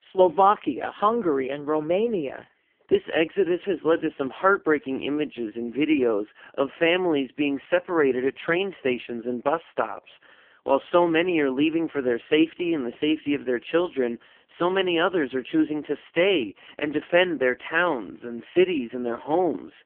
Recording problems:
phone-call audio; poor line; nothing above 3 kHz

